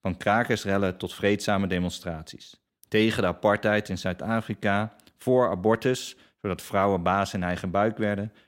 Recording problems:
none

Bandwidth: 16 kHz